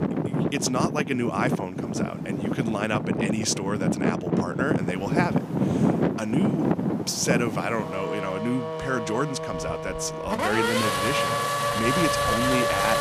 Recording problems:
traffic noise; very loud; throughout; 2 dB above the speech

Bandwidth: 15 kHz